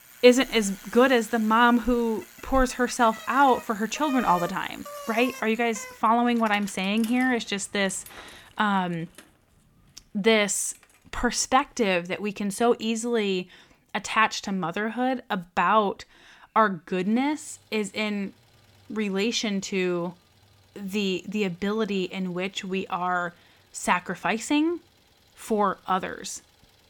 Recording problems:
traffic noise; noticeable; throughout; 15 dB below the speech

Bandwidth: 18 kHz